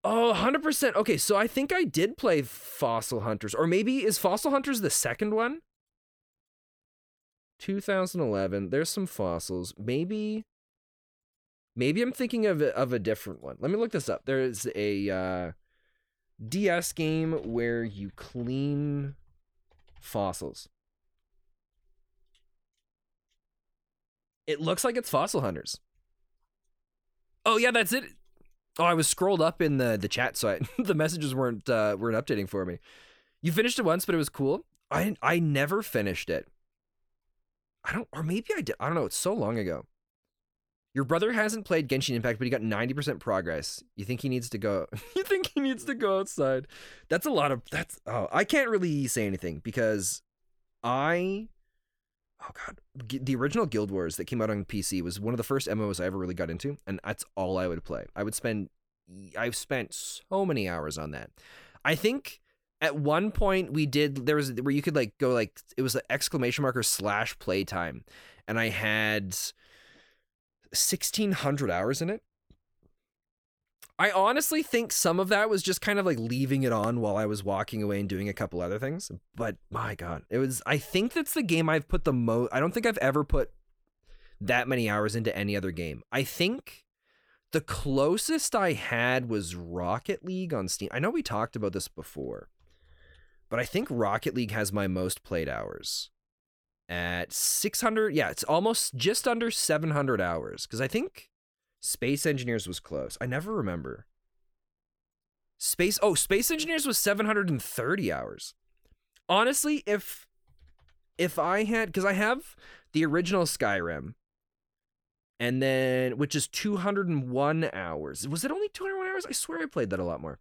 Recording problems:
none

